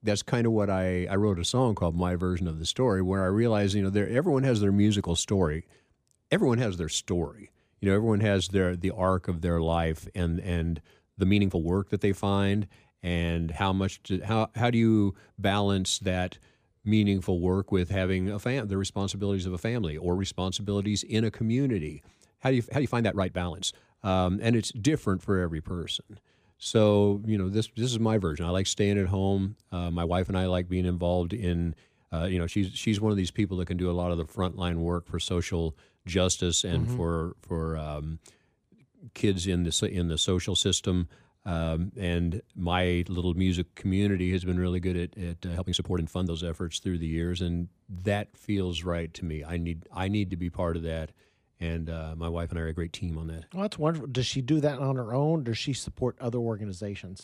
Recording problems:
uneven, jittery; strongly; from 1 to 54 s

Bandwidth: 15 kHz